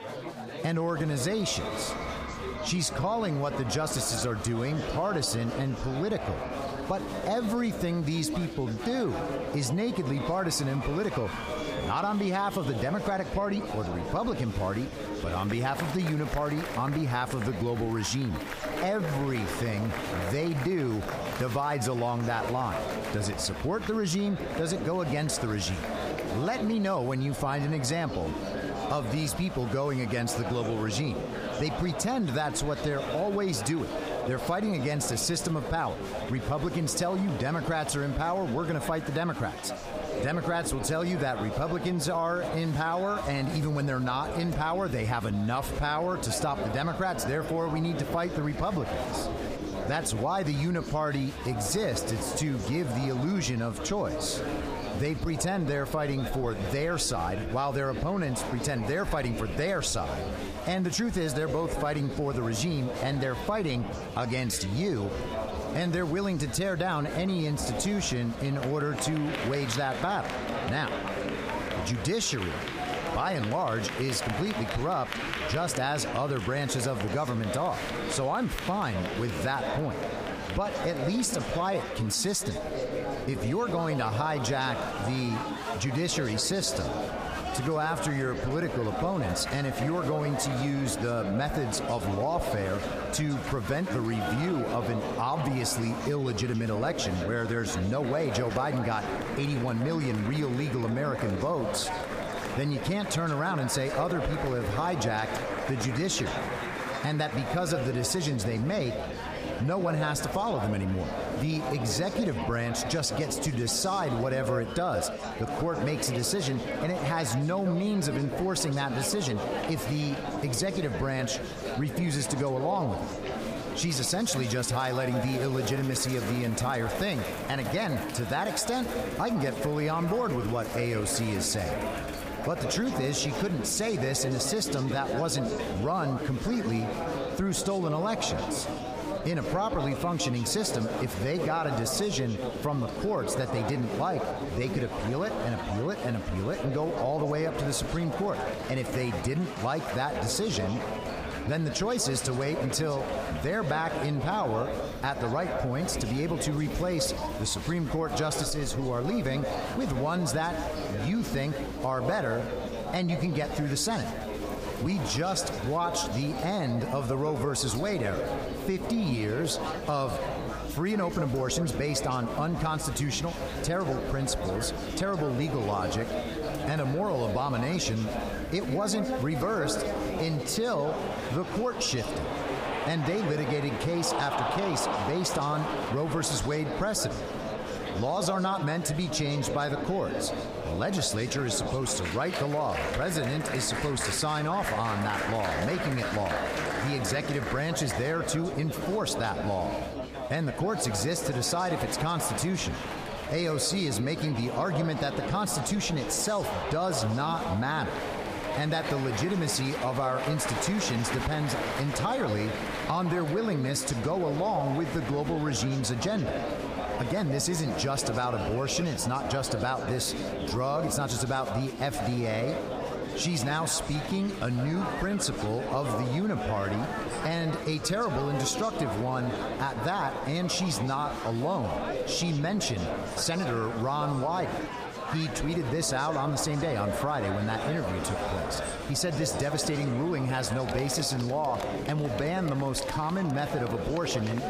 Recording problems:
echo of what is said; strong; from 1:19 on; 160 ms later, 10 dB below the speech
squashed, flat; heavily, background pumping
chatter from many people; loud; throughout; 6 dB below the speech

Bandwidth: 15 kHz